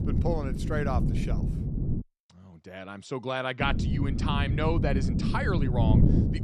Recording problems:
wind noise on the microphone; heavy; until 2 s and from 3.5 s on; 5 dB below the speech

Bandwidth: 13.5 kHz